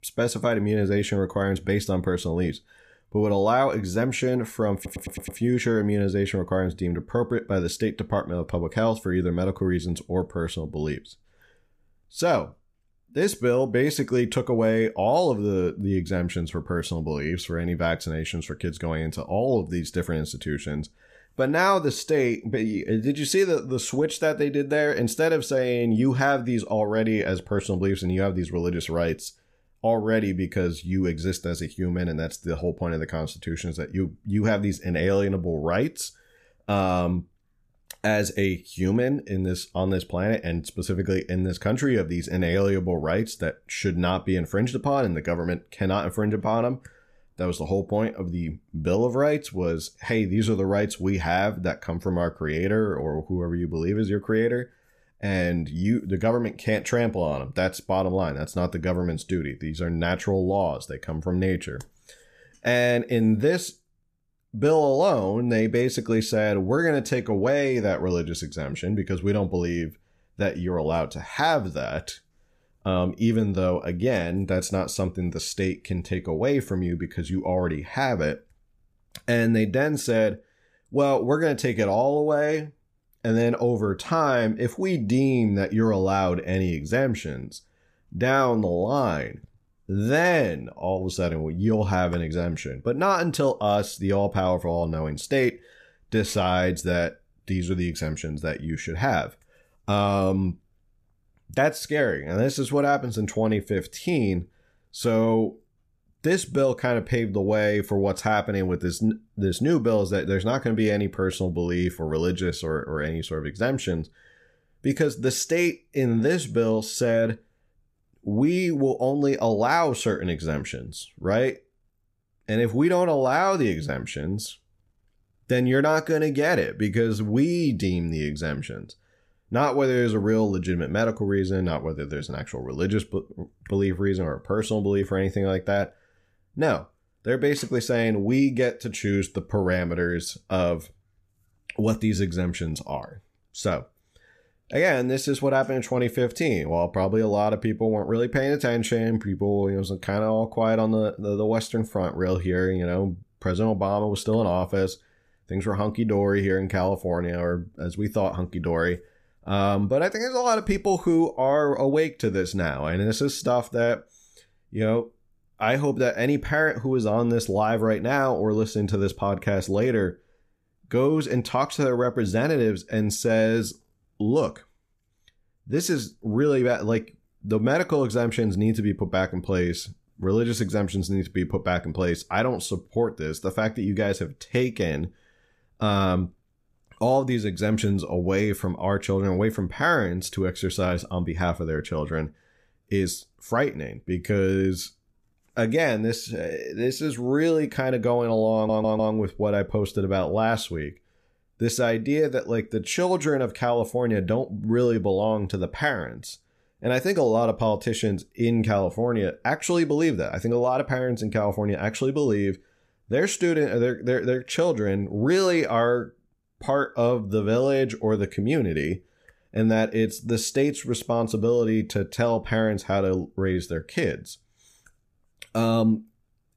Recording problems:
audio stuttering; at 5 s and at 3:19

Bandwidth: 14.5 kHz